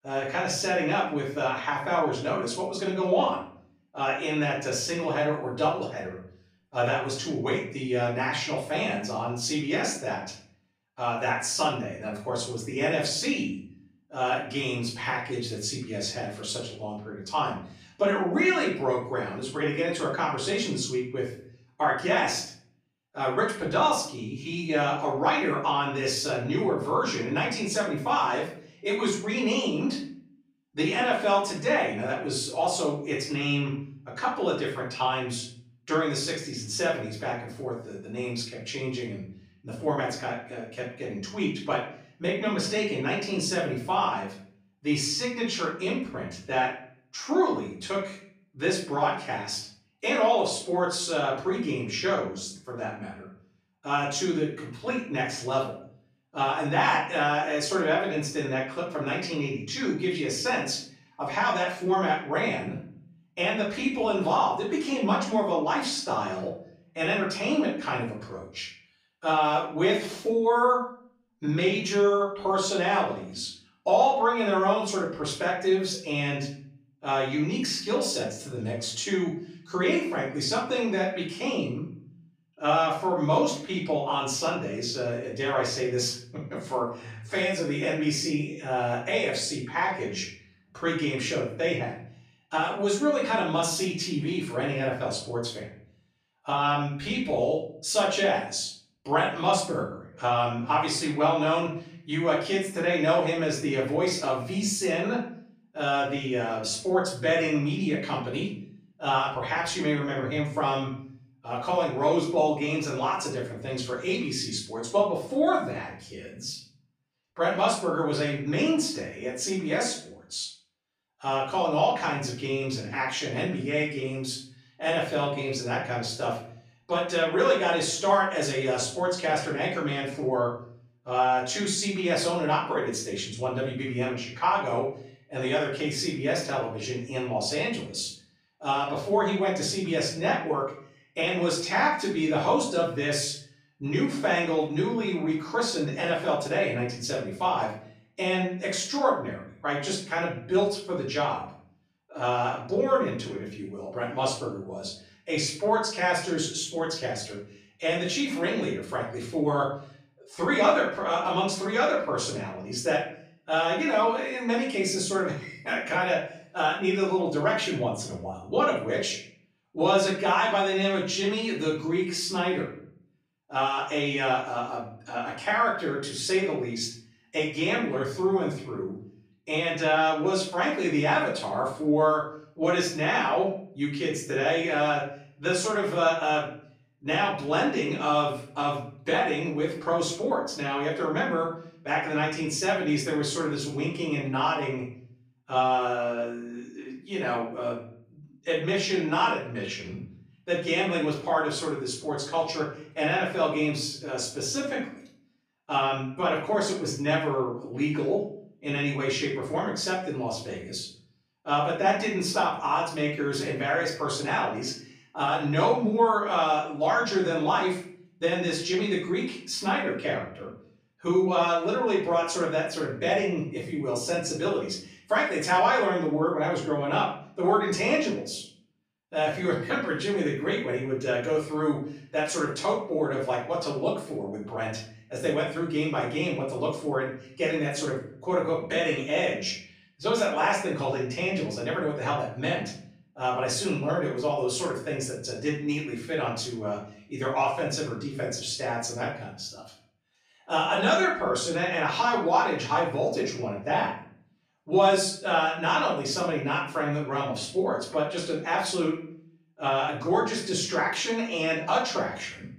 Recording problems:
off-mic speech; far
room echo; noticeable; dies away in 0.5 s

